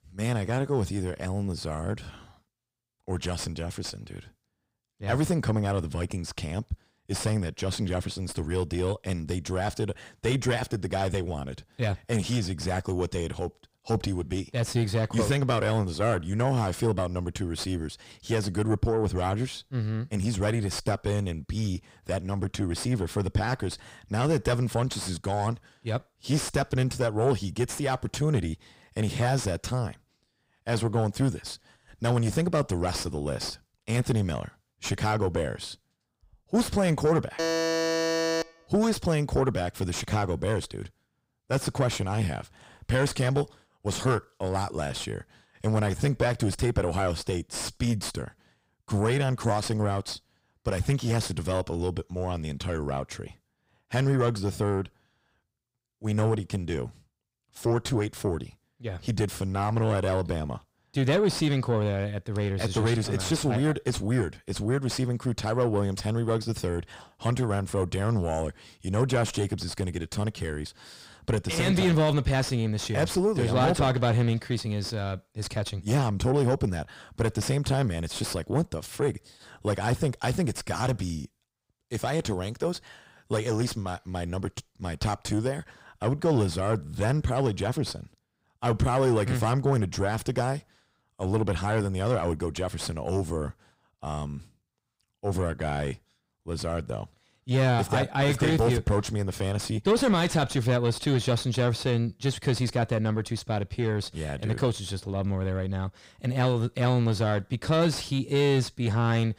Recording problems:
distortion; slight; 10 dB below the speech
alarm; loud; from 37 to 38 s; peak 2 dB above the speech

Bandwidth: 15.5 kHz